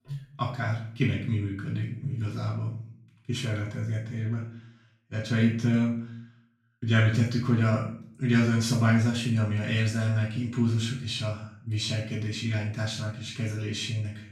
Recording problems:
off-mic speech; far
room echo; noticeable; dies away in 0.5 s

